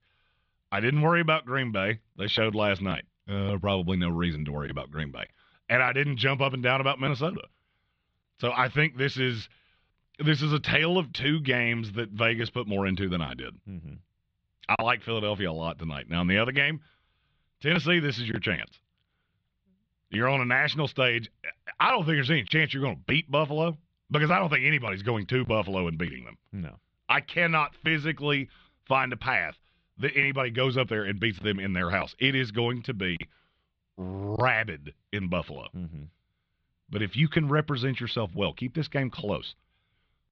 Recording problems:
muffled; slightly; fading above 4 kHz

